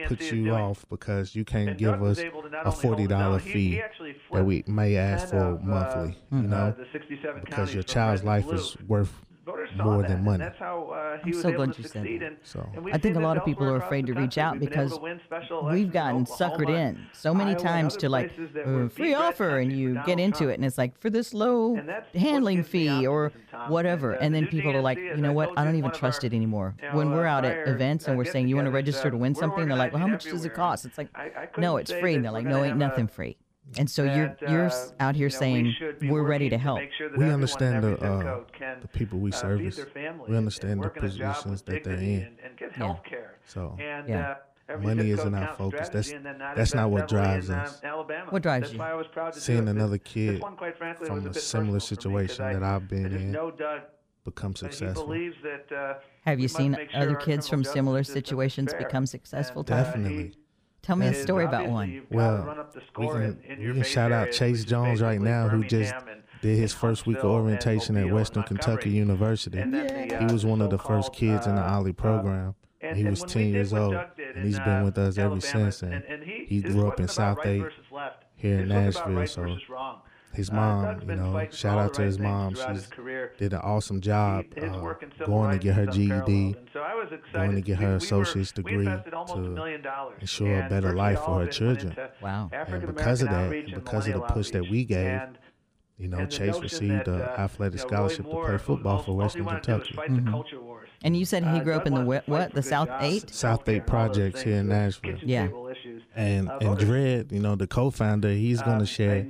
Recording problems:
voice in the background; loud; throughout; 8 dB below the speech

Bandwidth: 15 kHz